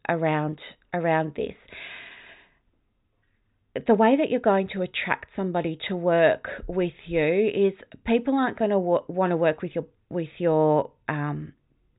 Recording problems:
high frequencies cut off; severe; nothing above 4 kHz

